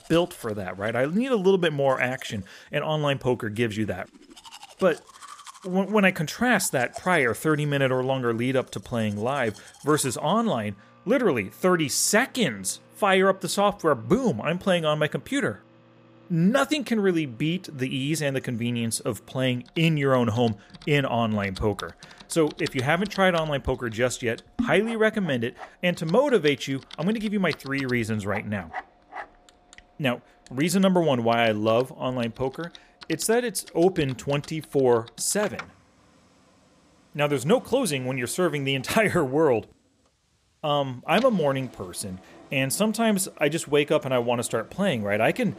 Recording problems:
household noises; faint; throughout; 20 dB below the speech

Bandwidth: 15 kHz